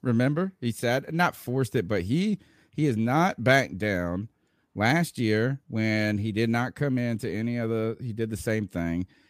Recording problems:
none

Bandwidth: 15 kHz